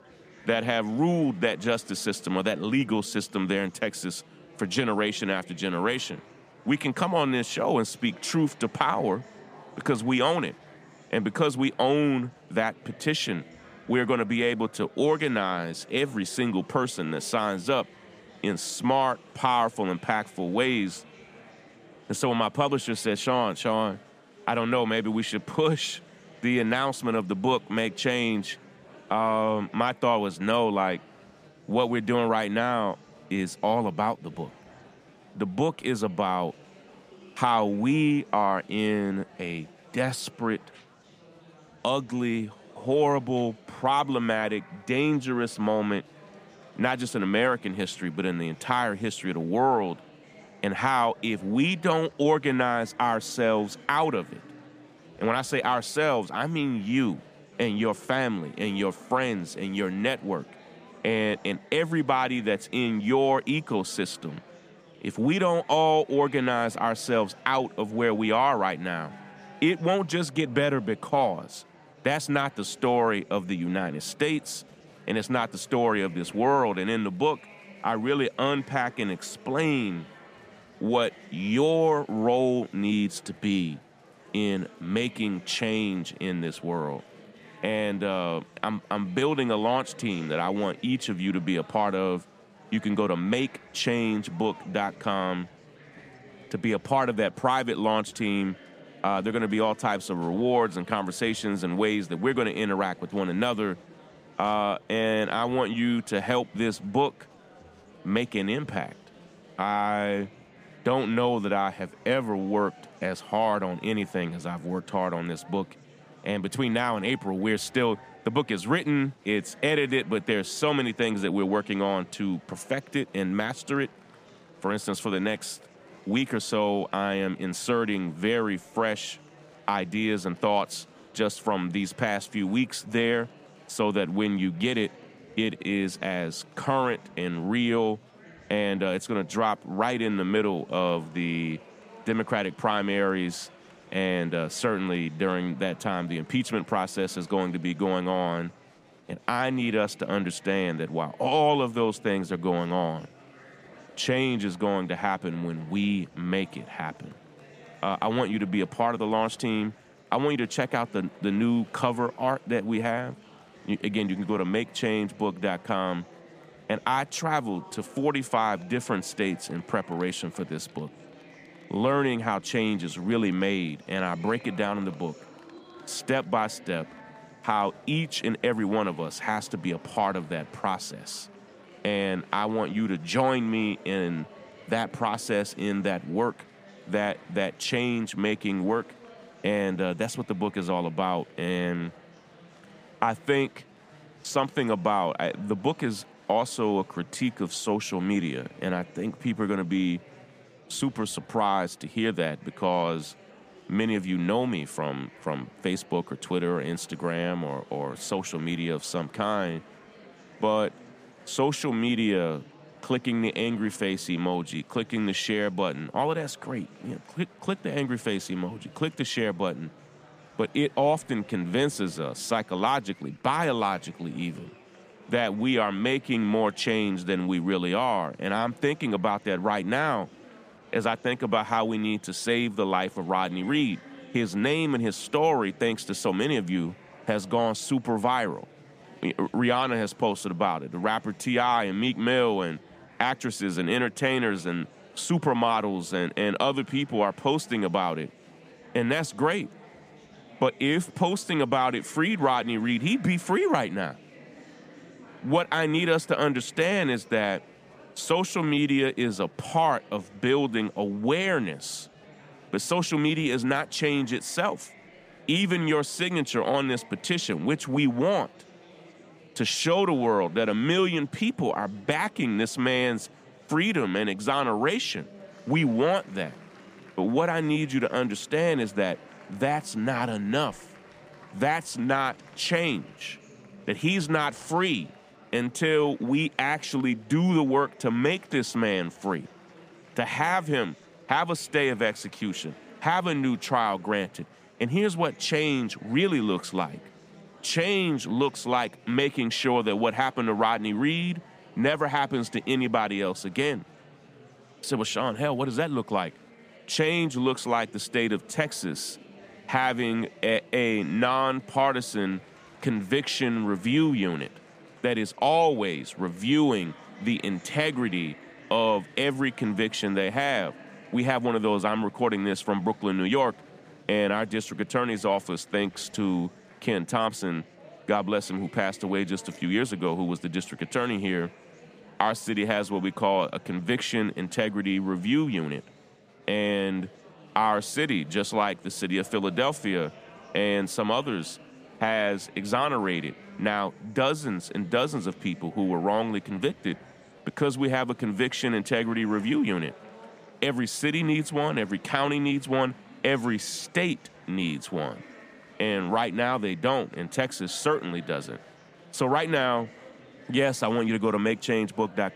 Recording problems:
murmuring crowd; faint; throughout; 25 dB below the speech

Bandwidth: 15 kHz